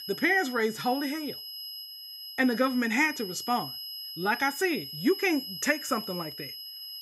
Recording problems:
high-pitched whine; loud; throughout; 5 kHz, 9 dB below the speech

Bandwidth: 15.5 kHz